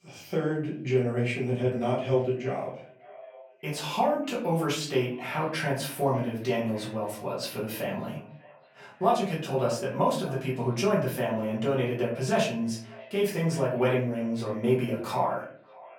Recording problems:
off-mic speech; far
echo of what is said; faint; throughout; 590 ms later, 20 dB below the speech
room echo; slight; dies away in 0.5 s

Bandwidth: 18 kHz